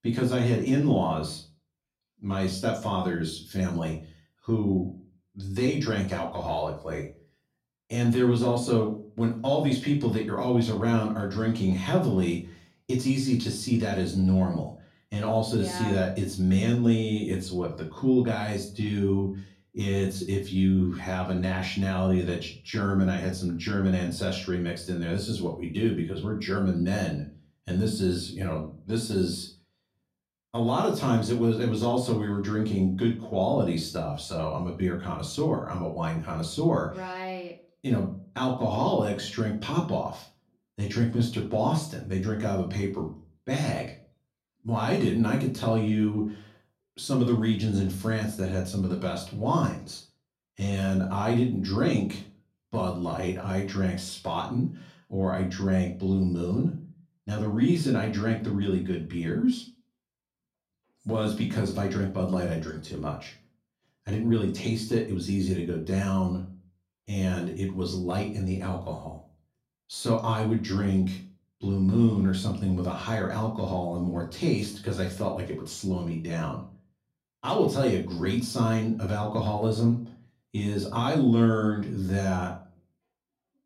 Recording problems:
off-mic speech; far
room echo; slight; dies away in 0.3 s

